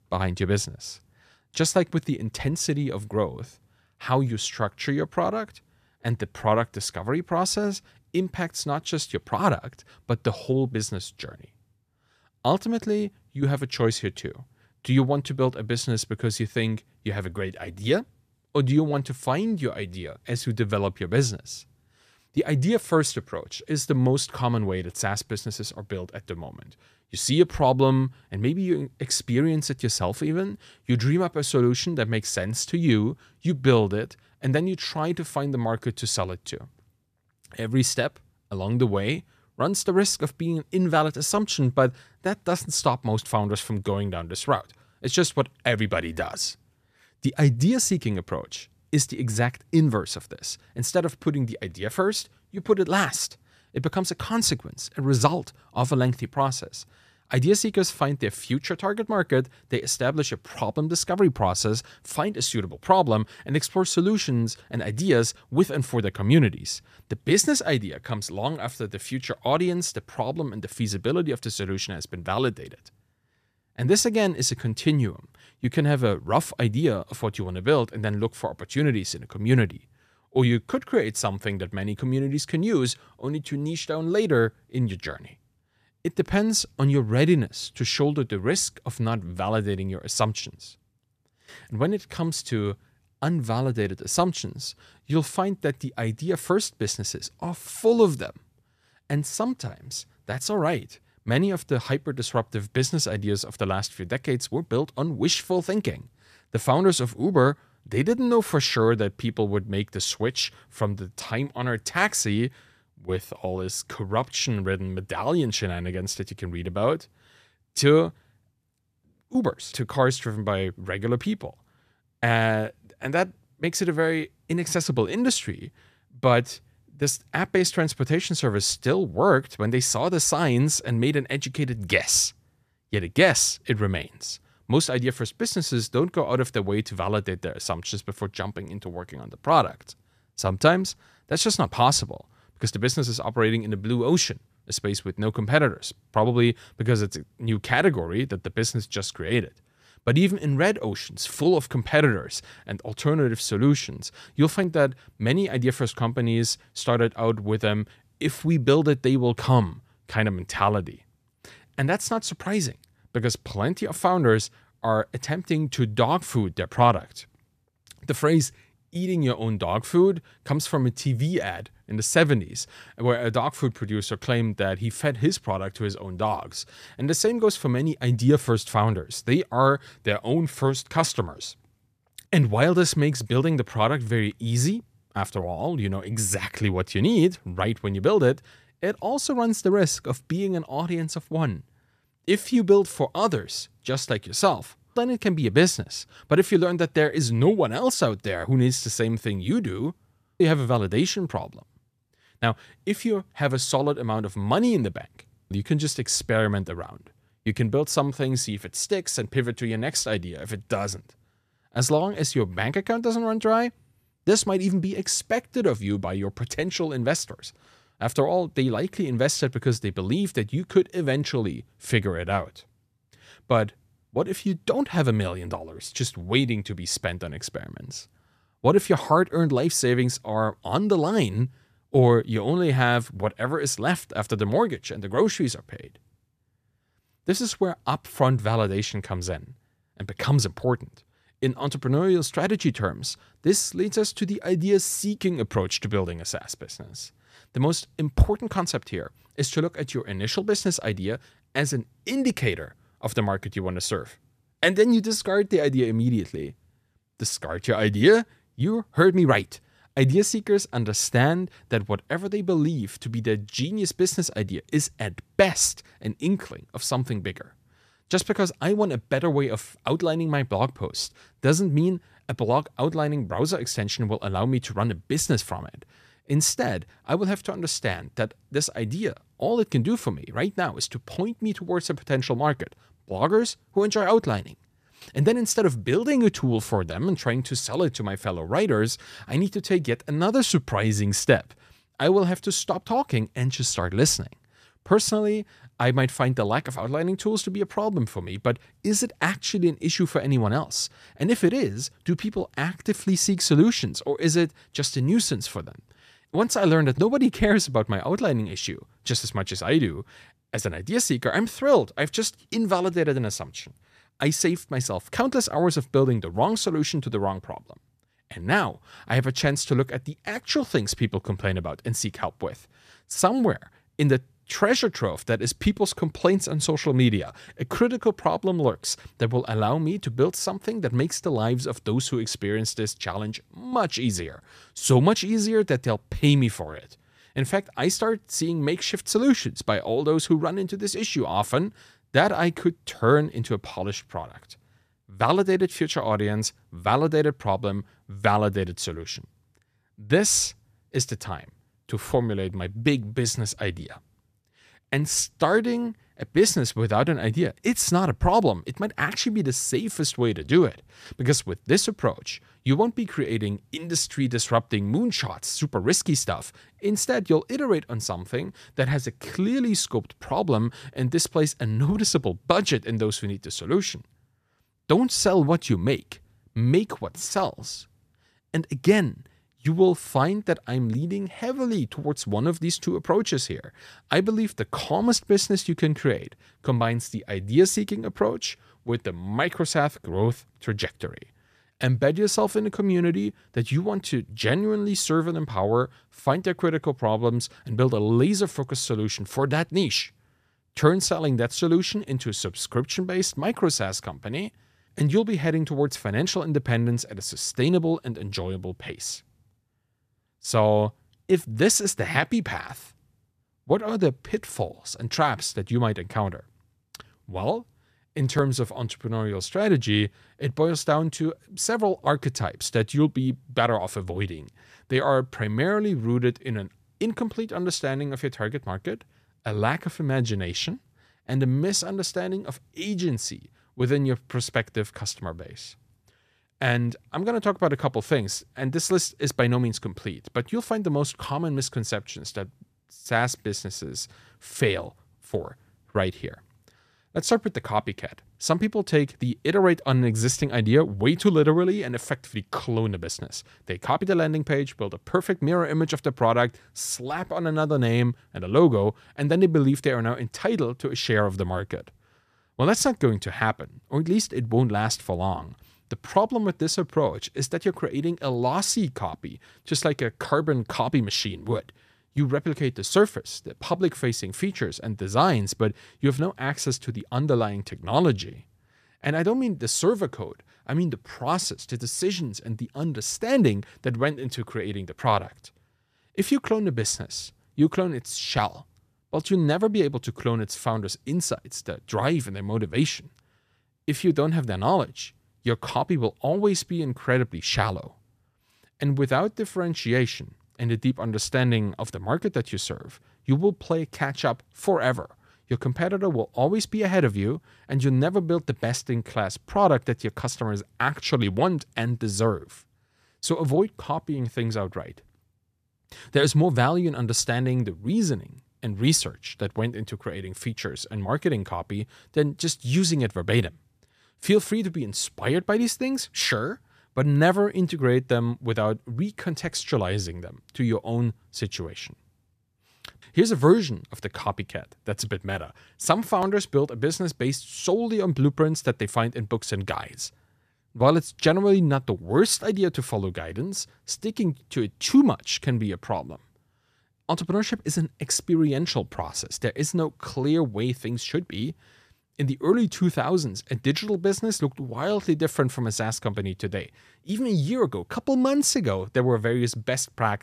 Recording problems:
none

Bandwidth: 14.5 kHz